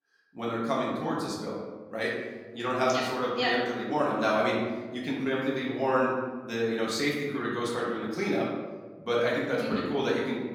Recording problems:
off-mic speech; far
room echo; noticeable; dies away in 1.1 s

